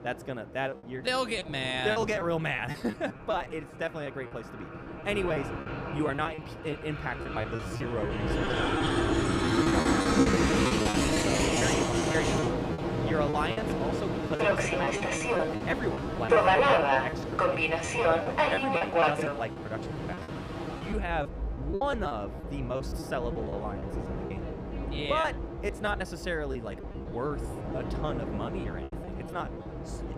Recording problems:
train or aircraft noise; very loud; throughout; 5 dB above the speech
choppy; very; 13% of the speech affected

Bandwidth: 15 kHz